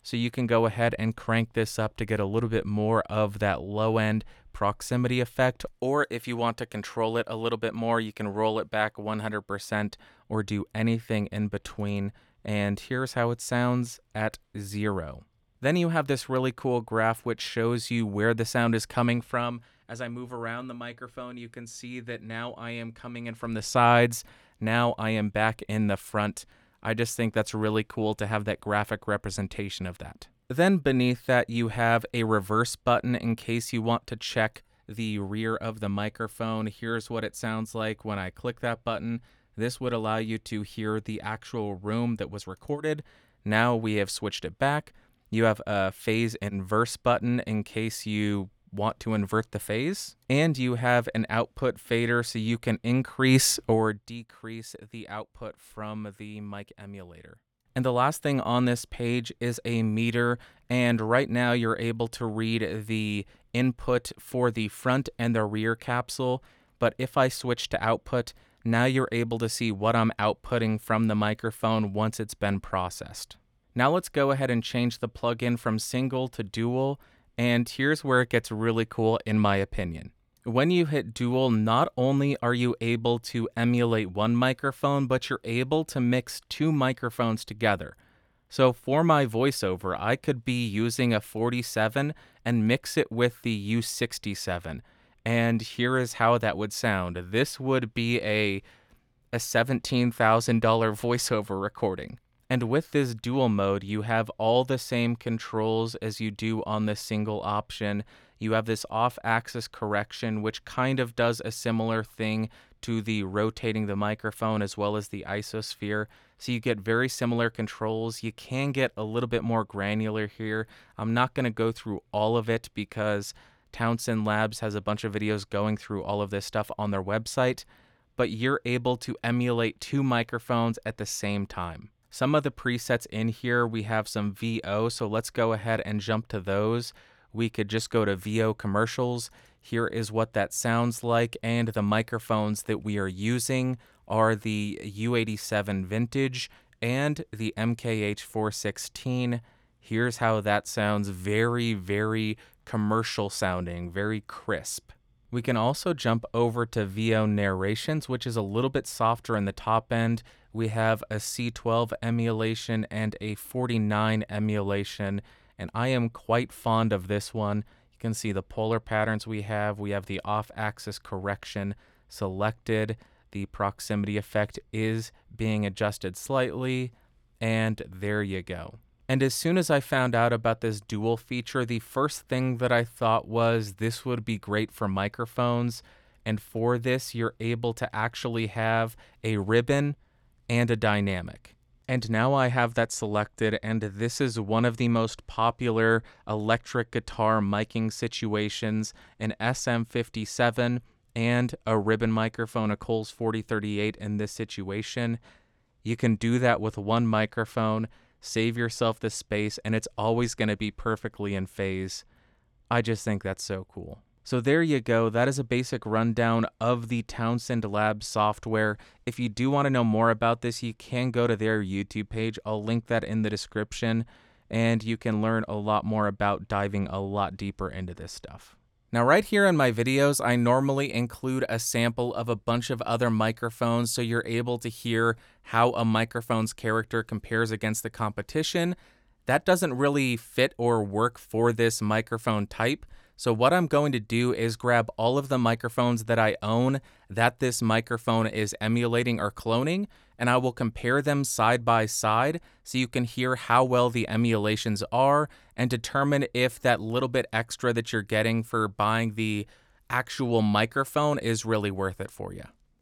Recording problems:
none

